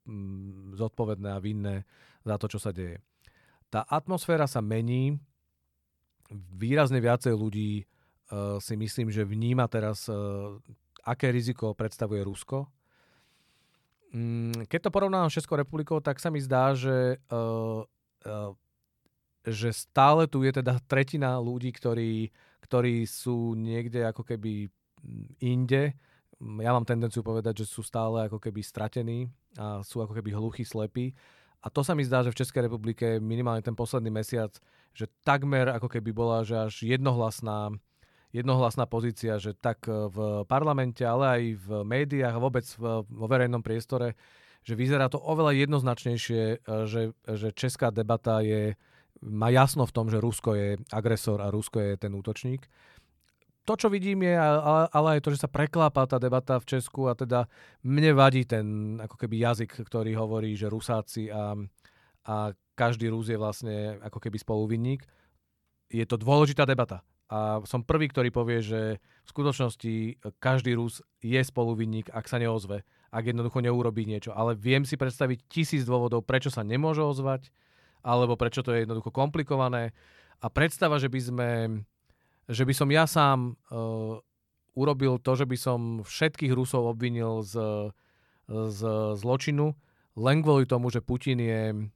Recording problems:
none

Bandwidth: 18 kHz